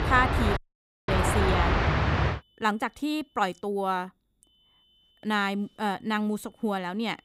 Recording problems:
train or aircraft noise; very loud; until 2.5 s; 3 dB above the speech
high-pitched whine; faint; from 1 to 3.5 s and from 4.5 s on; 3 kHz, 35 dB below the speech
audio cutting out; at 0.5 s for 0.5 s

